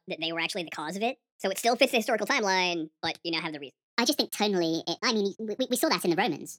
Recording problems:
wrong speed and pitch; too fast and too high; 1.5 times normal speed

